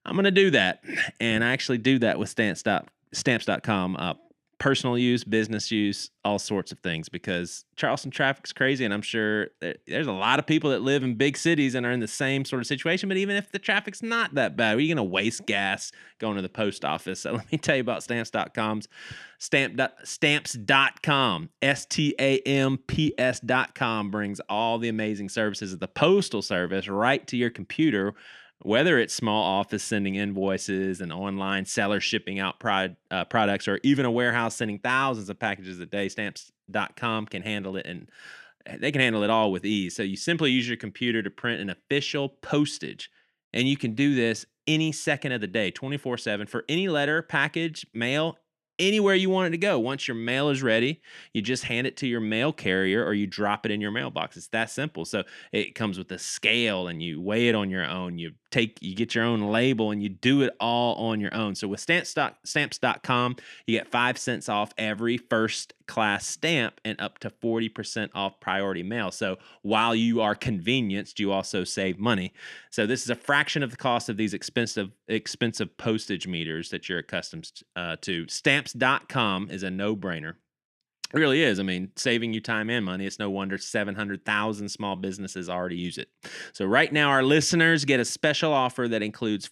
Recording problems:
none

